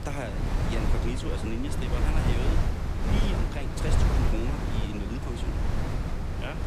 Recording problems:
wind noise on the microphone; heavy; 3 dB above the speech

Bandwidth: 14.5 kHz